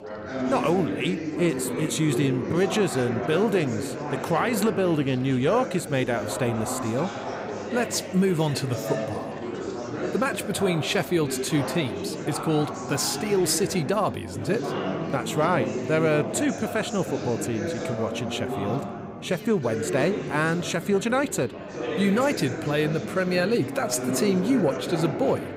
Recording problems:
chatter from many people; loud; throughout; 6 dB below the speech

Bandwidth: 15.5 kHz